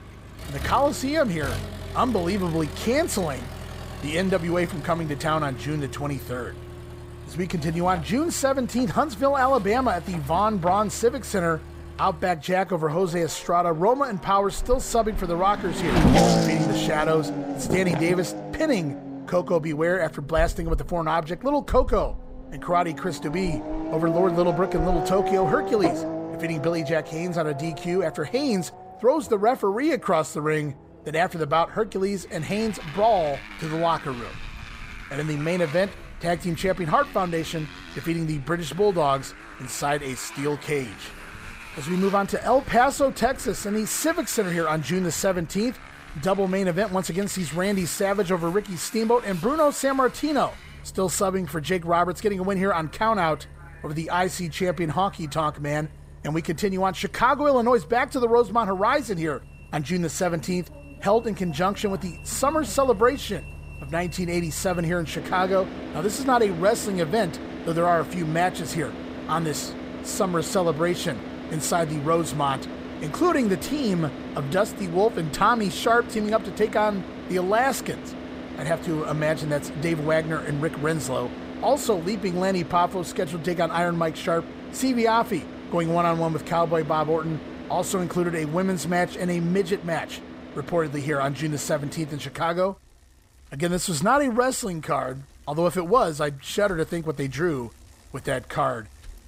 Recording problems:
traffic noise; loud; throughout; 9 dB below the speech

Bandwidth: 15.5 kHz